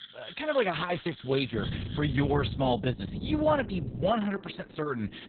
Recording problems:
garbled, watery; badly; nothing above 4 kHz
animal sounds; noticeable; throughout; 15 dB below the speech
wind noise on the microphone; occasional gusts; from 1.5 to 4 s; 15 dB below the speech

